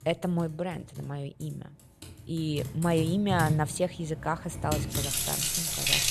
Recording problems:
household noises; very loud; throughout; 1 dB above the speech

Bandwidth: 13.5 kHz